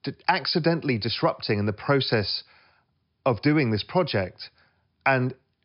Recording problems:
high frequencies cut off; noticeable; nothing above 5.5 kHz

